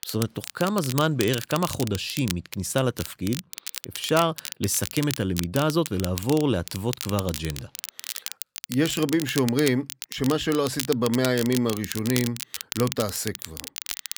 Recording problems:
crackle, like an old record; loud; 9 dB below the speech

